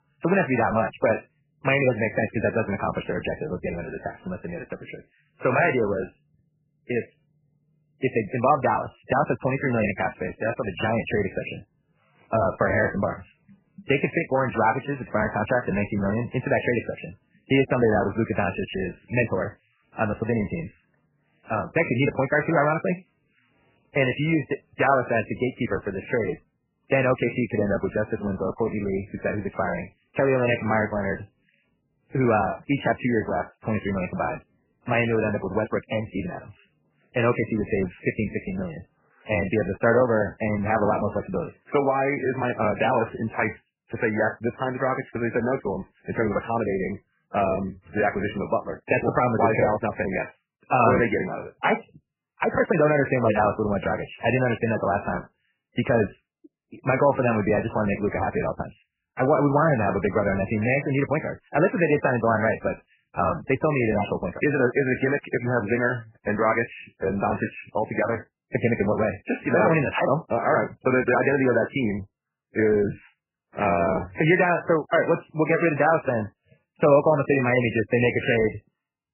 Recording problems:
garbled, watery; badly; nothing above 3 kHz
wrong speed, natural pitch; too fast; 1.5 times normal speed

